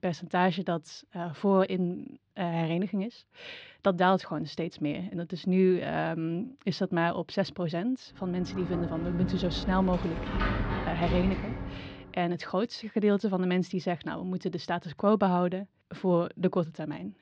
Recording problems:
muffled; slightly; fading above 4 kHz
door banging; noticeable; from 8.5 to 12 s; peak level with the speech

